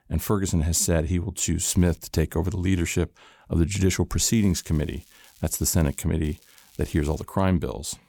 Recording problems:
crackling; faint; at 1.5 s, from 4.5 to 6 s and at 6 s; 30 dB below the speech

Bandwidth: 18.5 kHz